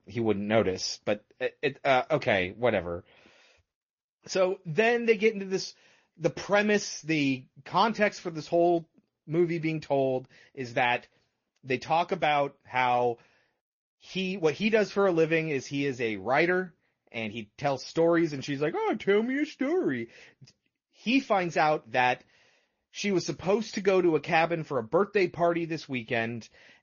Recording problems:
high frequencies cut off; noticeable; nothing above 6.5 kHz
garbled, watery; slightly

